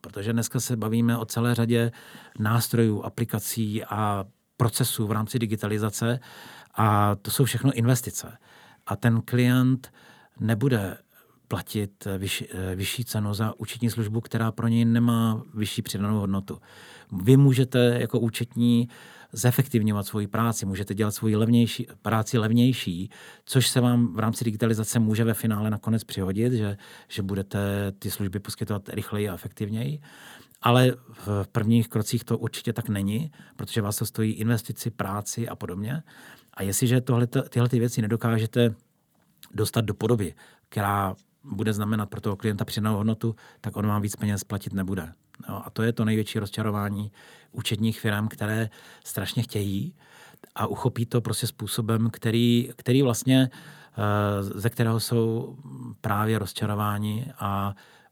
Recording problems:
none

